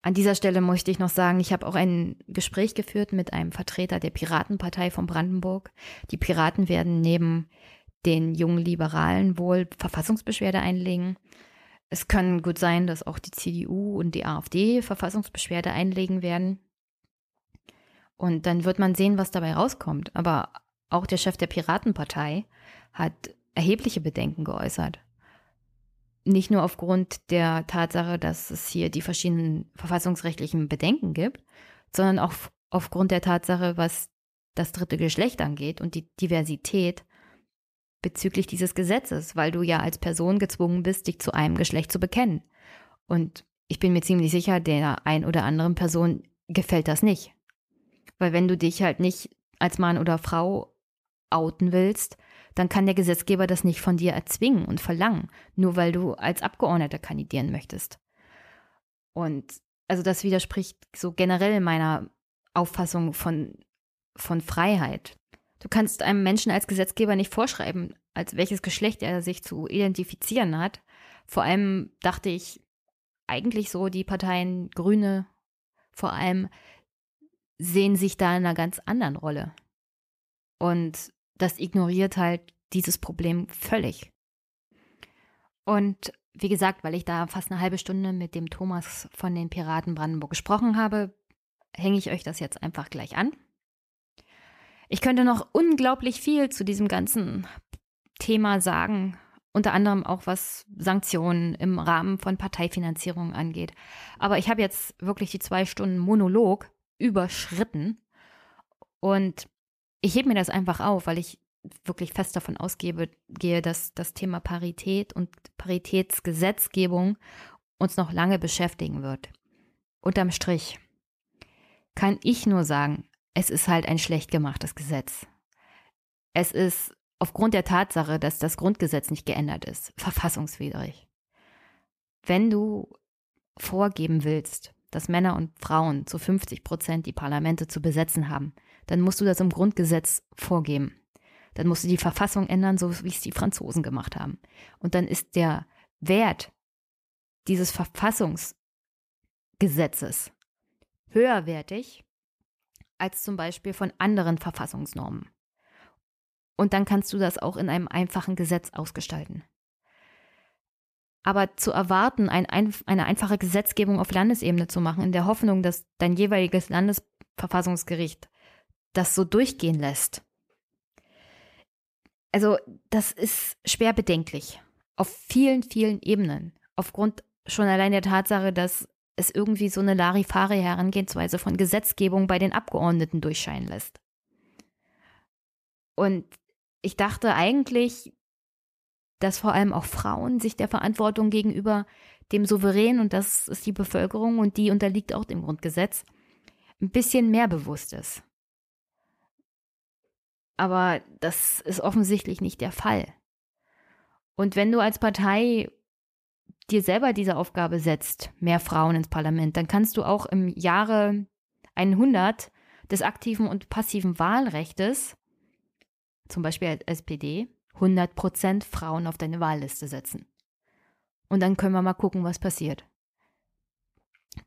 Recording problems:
none

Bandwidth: 14.5 kHz